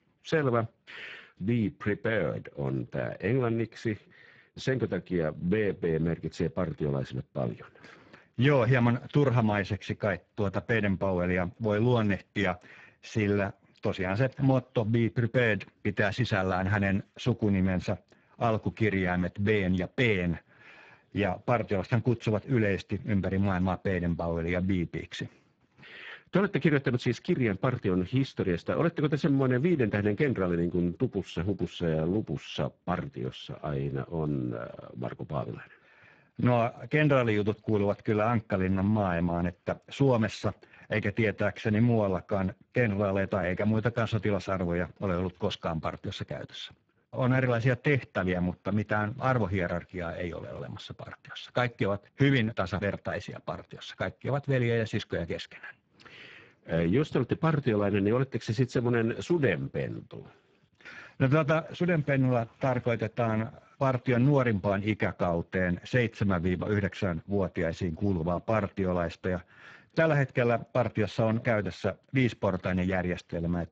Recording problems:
garbled, watery; badly
muffled; slightly; fading above 3 kHz

